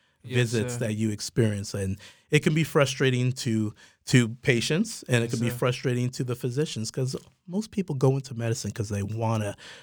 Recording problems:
none

